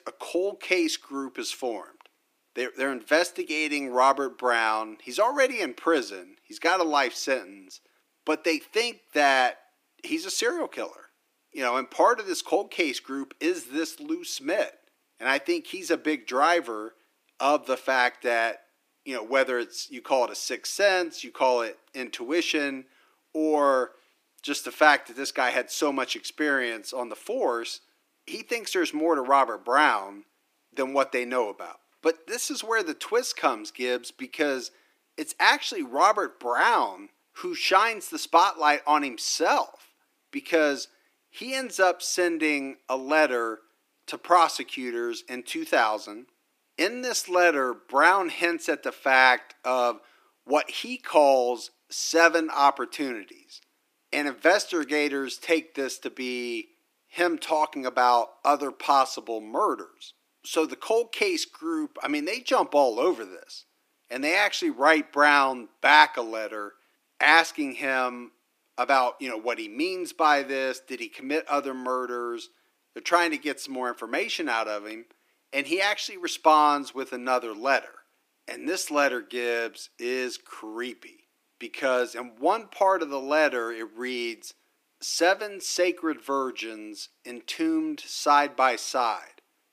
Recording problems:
thin; somewhat; fading below 300 Hz

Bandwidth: 15 kHz